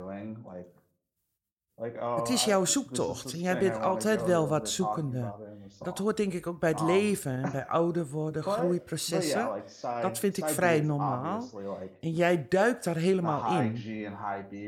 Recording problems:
voice in the background; loud; throughout; 7 dB below the speech

